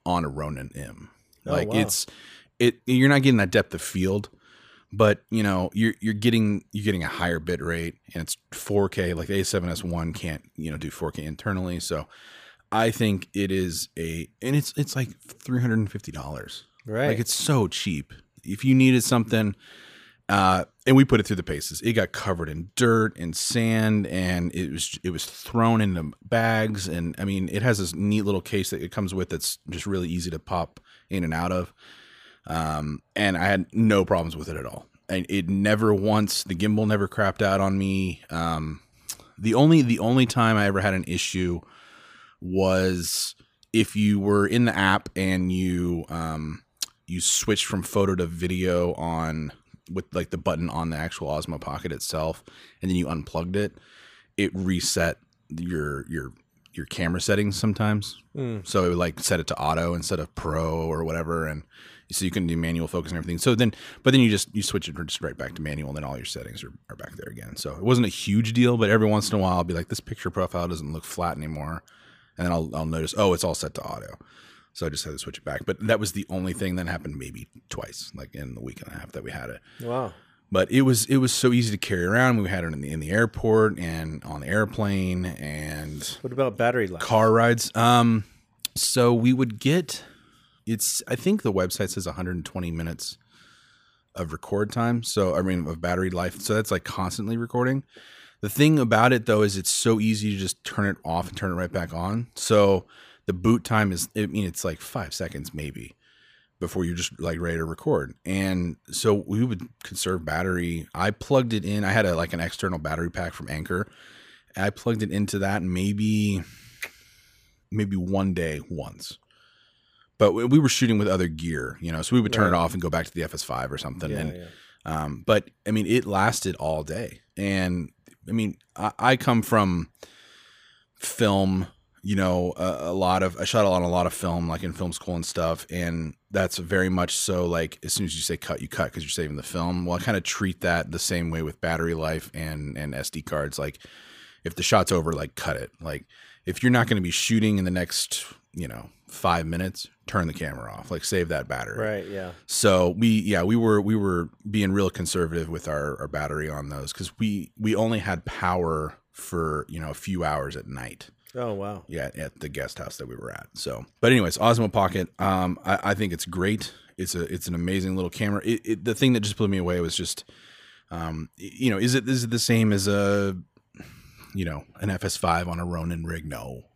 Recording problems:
none

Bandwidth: 15 kHz